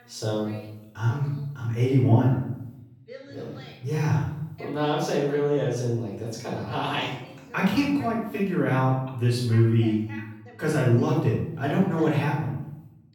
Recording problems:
off-mic speech; far
room echo; noticeable; dies away in 0.7 s
voice in the background; faint; throughout; 20 dB below the speech

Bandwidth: 18 kHz